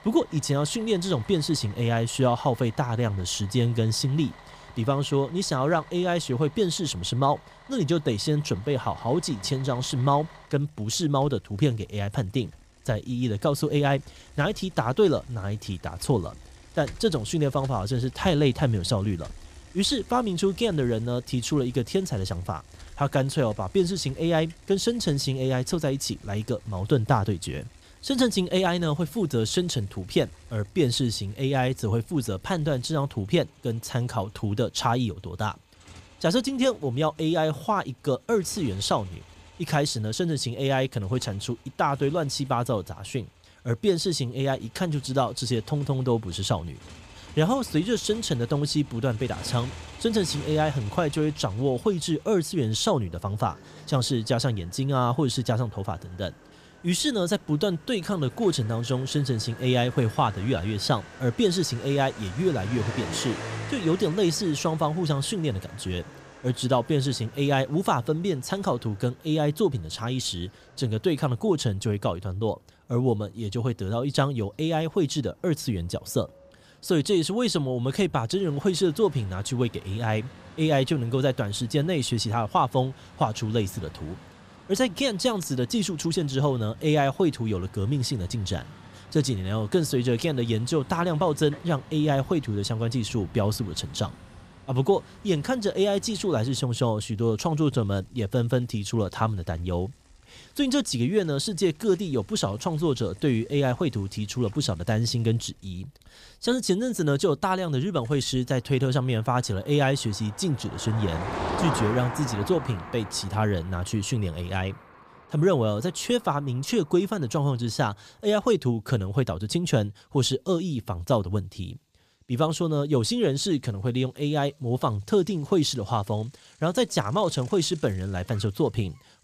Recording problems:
traffic noise; noticeable; throughout; 20 dB below the speech

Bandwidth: 15 kHz